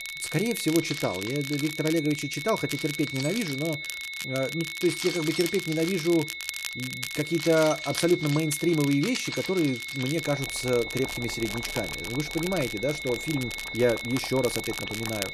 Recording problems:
high-pitched whine; loud; throughout; 2 kHz, 6 dB below the speech
household noises; noticeable; throughout; 10 dB below the speech
crackle, like an old record; noticeable; 10 dB below the speech

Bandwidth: 13.5 kHz